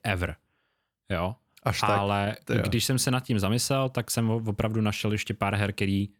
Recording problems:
none

